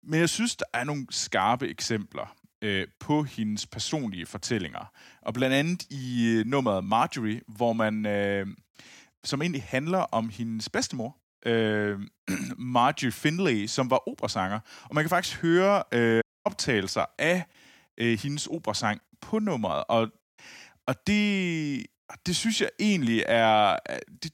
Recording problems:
audio cutting out; at 16 s

